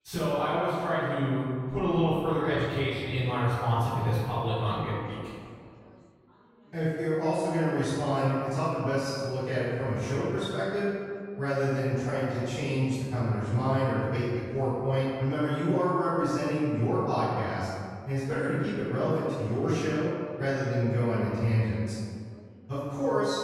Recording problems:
room echo; strong; dies away in 1.8 s
off-mic speech; far
background chatter; faint; throughout; 3 voices, 30 dB below the speech

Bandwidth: 16.5 kHz